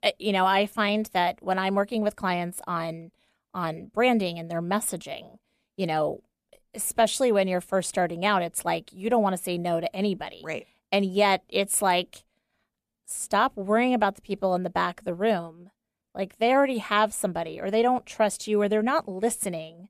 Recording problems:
none

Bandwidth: 14.5 kHz